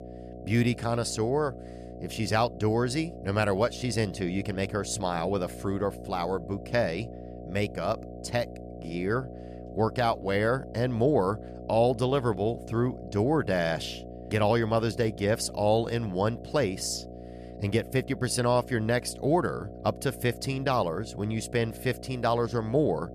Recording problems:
electrical hum; noticeable; throughout; 60 Hz, 15 dB below the speech

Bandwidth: 14.5 kHz